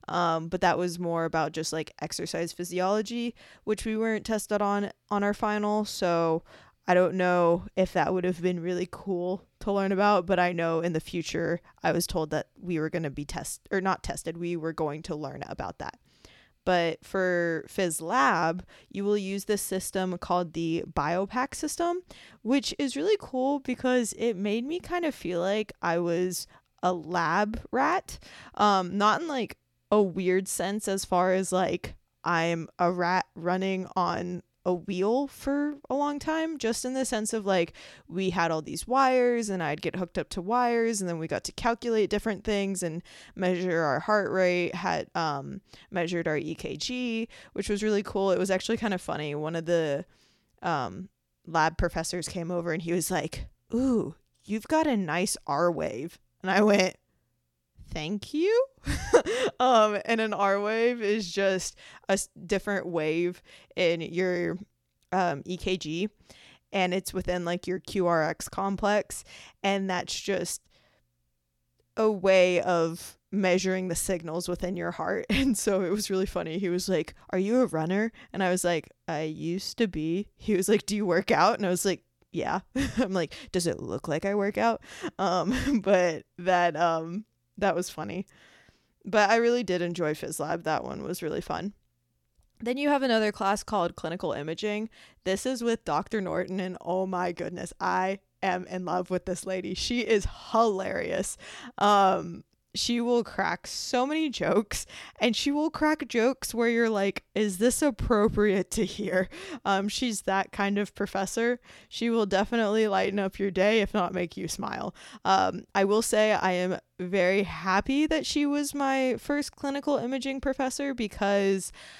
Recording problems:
none

